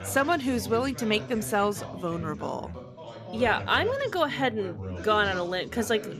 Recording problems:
background chatter; noticeable; throughout; 3 voices, 10 dB below the speech

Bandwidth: 14.5 kHz